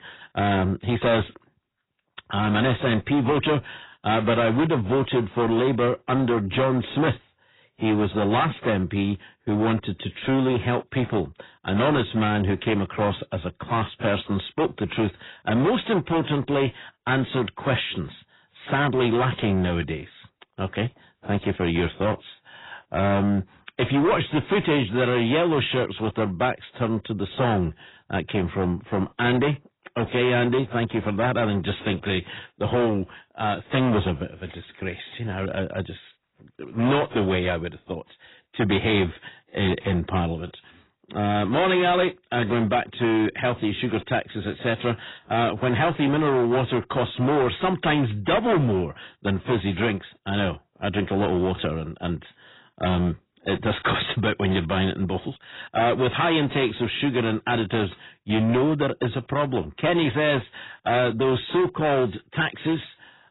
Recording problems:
distortion; heavy; 11% of the sound clipped
garbled, watery; badly; nothing above 4 kHz

